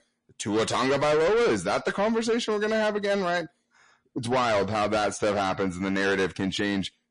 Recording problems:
distortion; heavy; 6 dB below the speech
garbled, watery; slightly; nothing above 10.5 kHz

